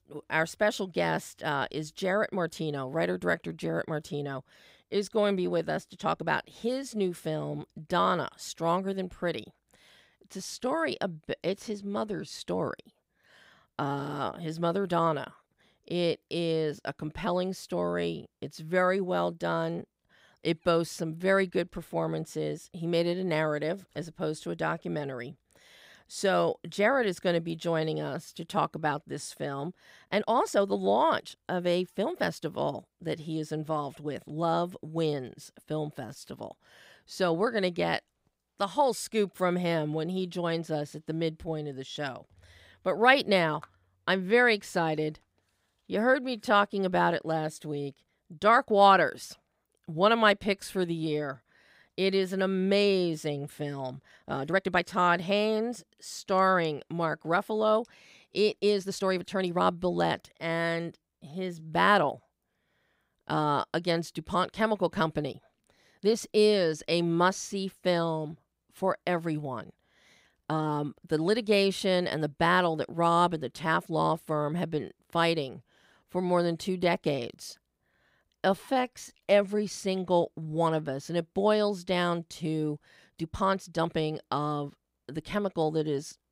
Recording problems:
uneven, jittery; strongly; from 6 s to 1:24

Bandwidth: 15.5 kHz